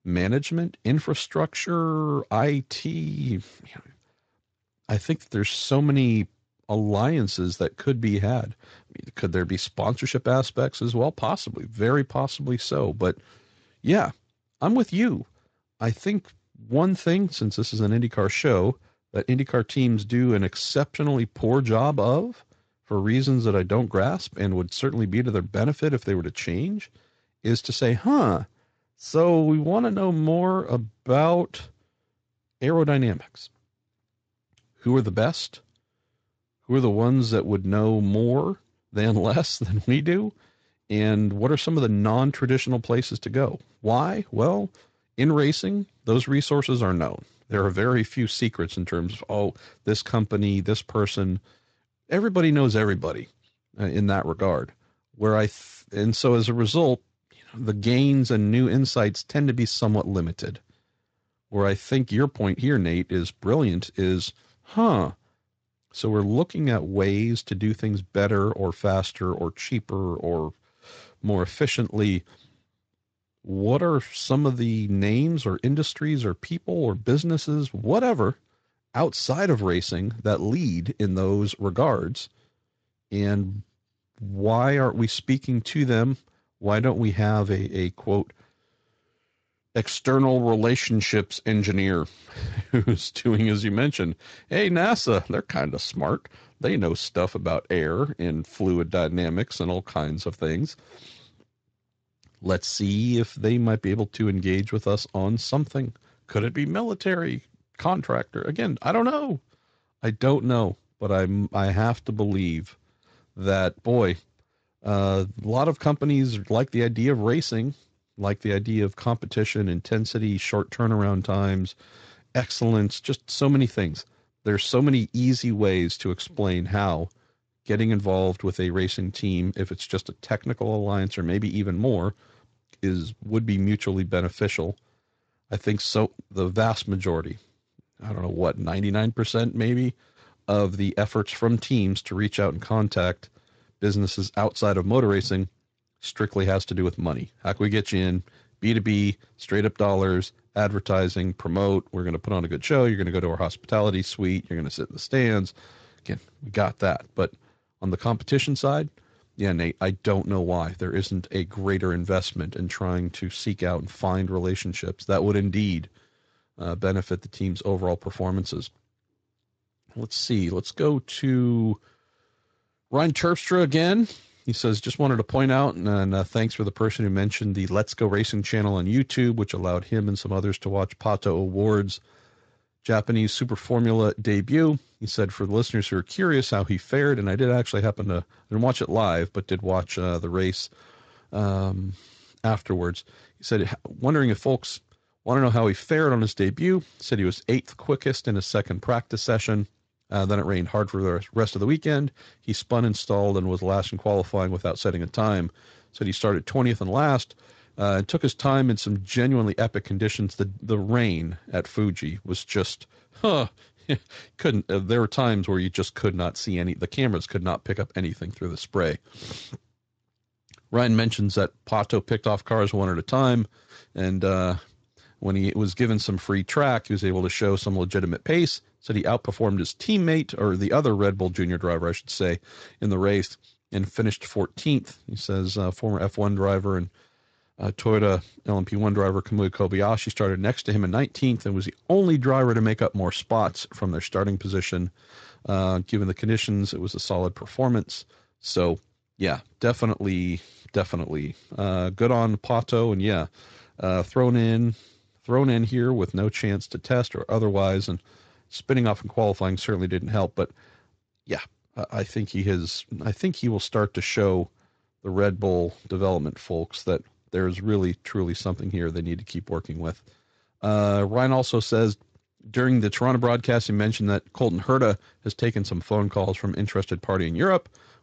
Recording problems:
garbled, watery; slightly; nothing above 7.5 kHz

